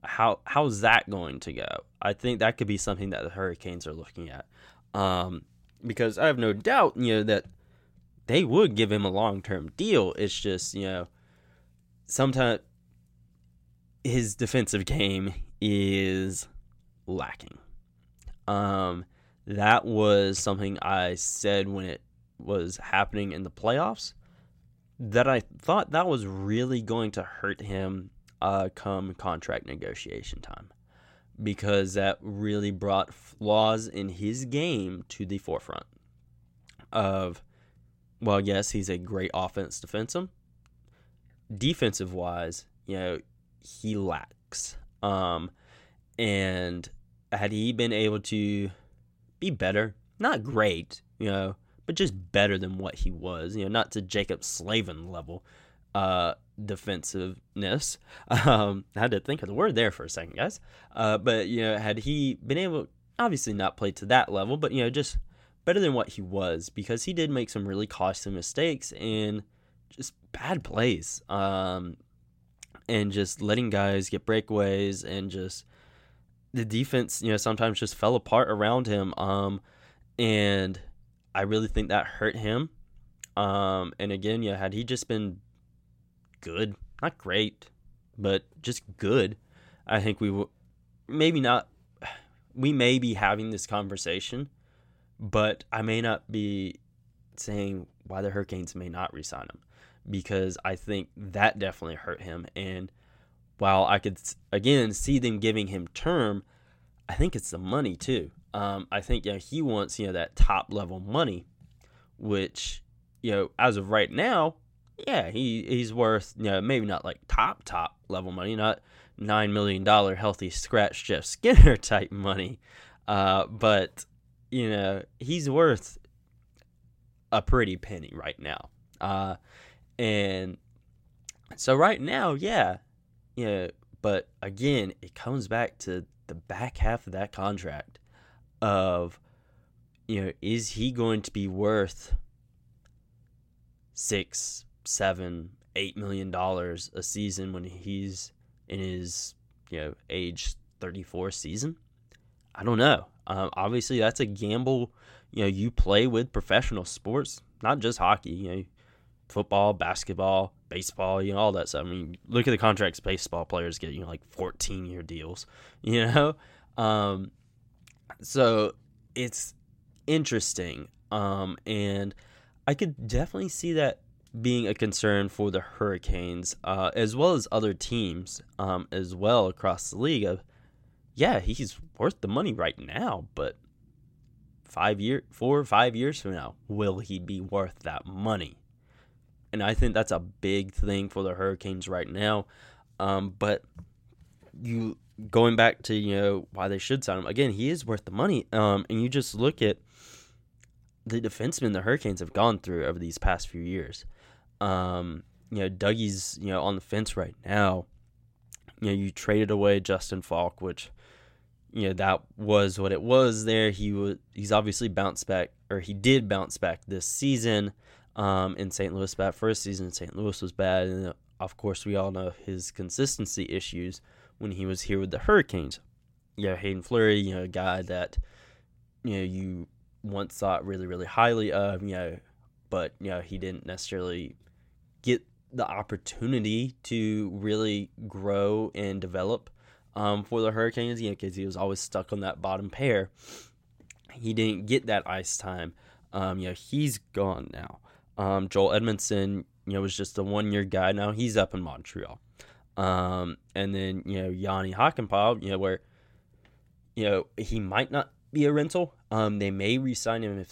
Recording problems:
none

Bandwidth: 16 kHz